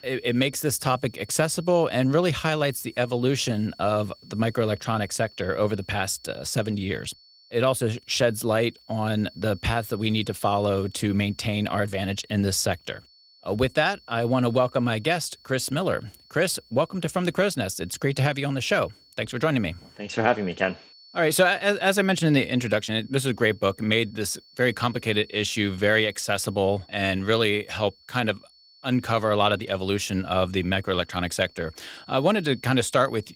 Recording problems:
garbled, watery; slightly
high-pitched whine; faint; throughout; 4.5 kHz, 25 dB below the speech

